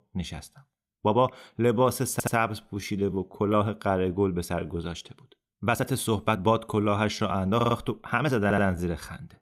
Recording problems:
uneven, jittery; strongly; from 1 to 9 s
audio stuttering; at 2 s, at 7.5 s and at 8.5 s

